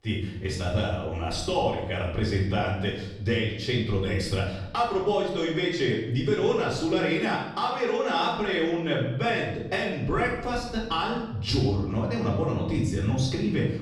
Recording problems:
off-mic speech; far
room echo; noticeable; dies away in 0.9 s

